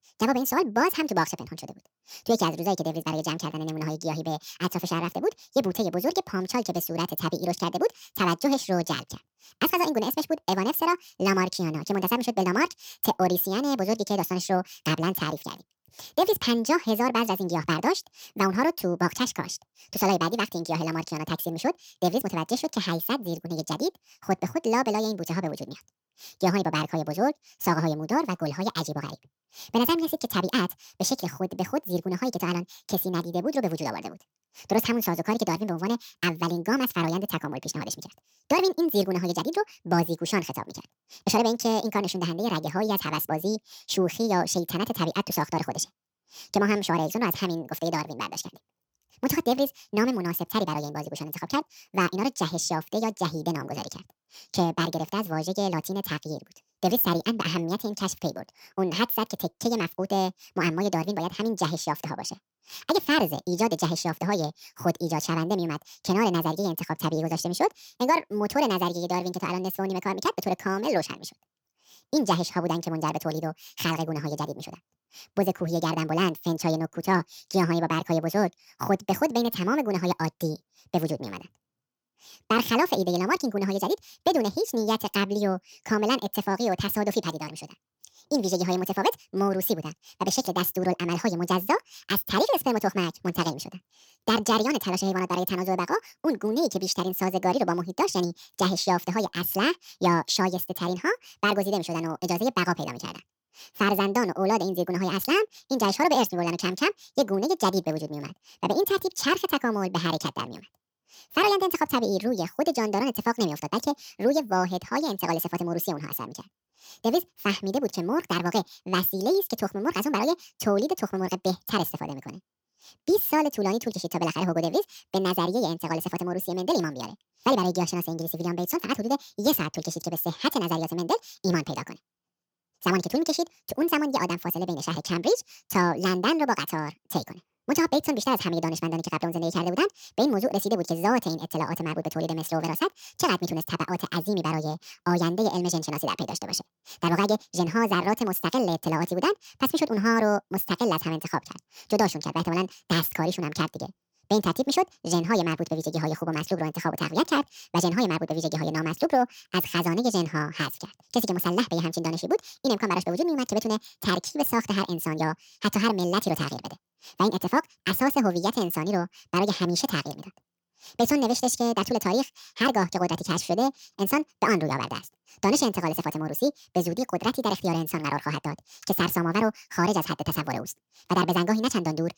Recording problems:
wrong speed and pitch; too fast and too high; 1.7 times normal speed

